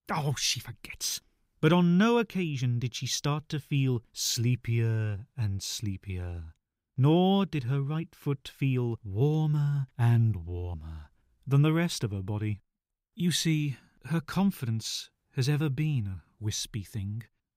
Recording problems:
none

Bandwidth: 15.5 kHz